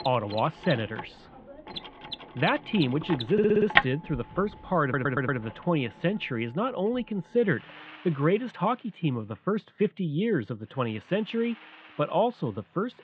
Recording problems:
muffled; very; fading above 3 kHz
machinery noise; loud; throughout; 5 dB below the speech
audio stuttering; at 3.5 s and at 5 s

